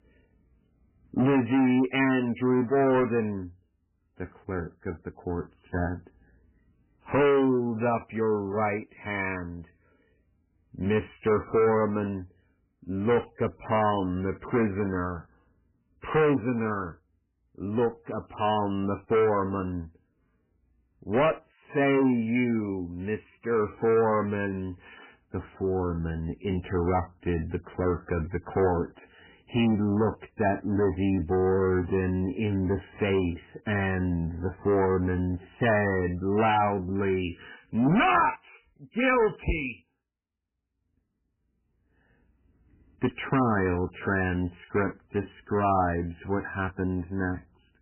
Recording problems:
distortion; heavy; 7 dB below the speech
garbled, watery; badly; nothing above 3 kHz

